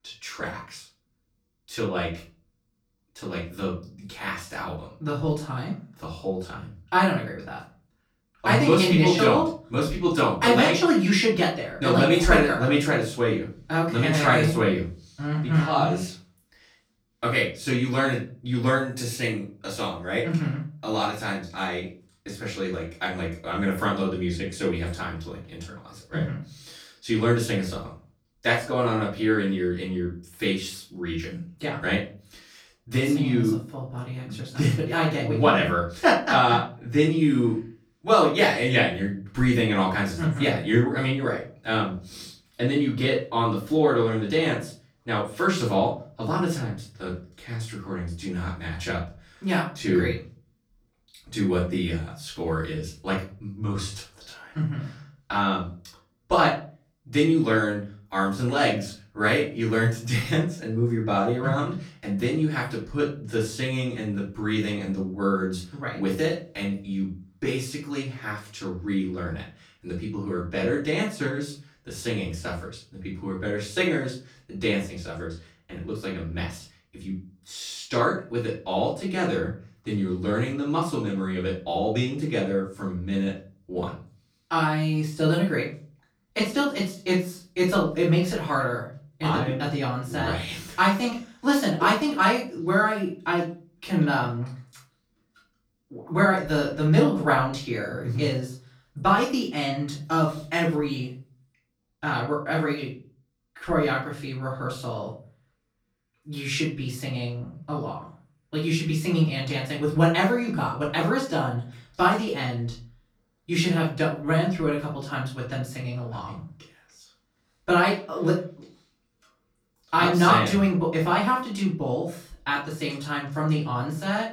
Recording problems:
off-mic speech; far
room echo; slight; dies away in 0.3 s

